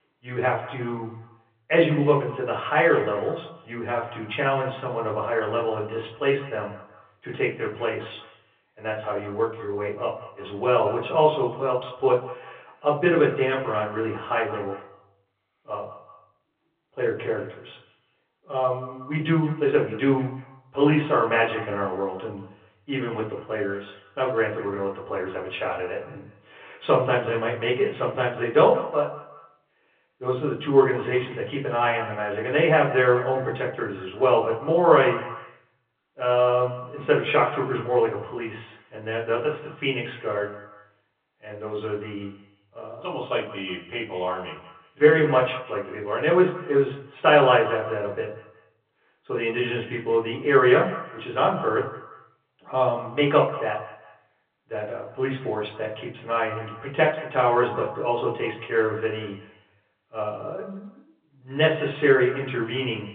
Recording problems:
off-mic speech; far
echo of what is said; noticeable; throughout; 180 ms later, 15 dB below the speech
room echo; slight; dies away in 0.4 s
phone-call audio

